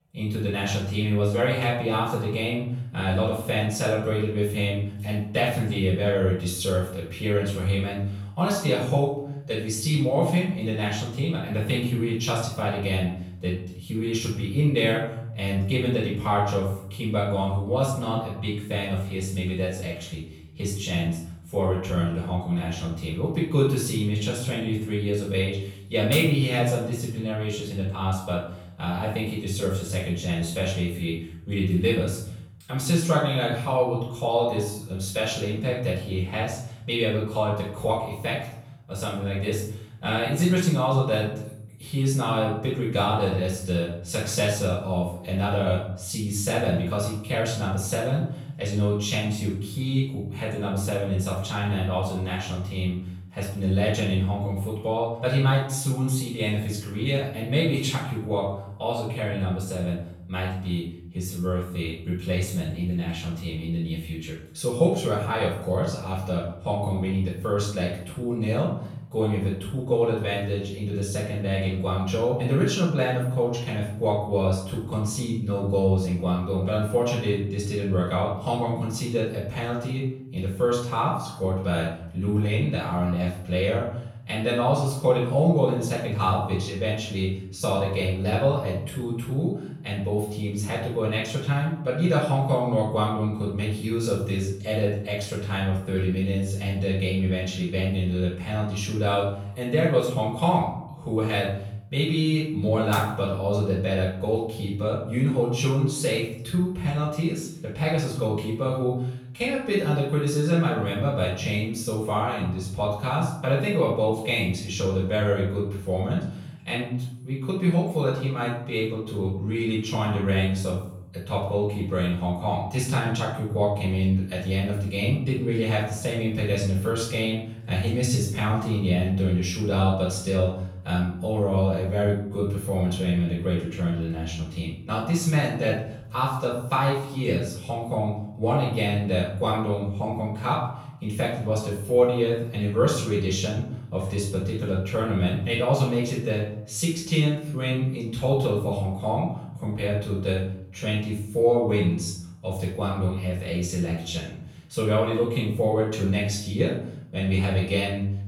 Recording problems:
off-mic speech; far
room echo; noticeable; dies away in 0.6 s

